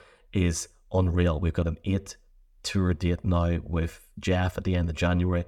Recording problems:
none

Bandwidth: 18 kHz